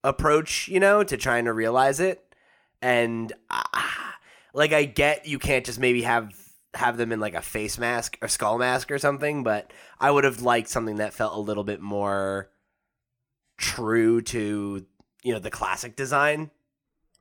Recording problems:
none

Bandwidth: 18.5 kHz